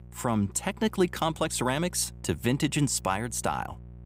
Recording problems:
electrical hum; faint; throughout; 60 Hz, 30 dB below the speech

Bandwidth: 15.5 kHz